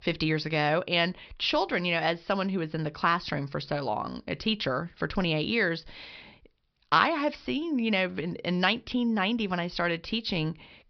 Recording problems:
high frequencies cut off; noticeable; nothing above 5.5 kHz

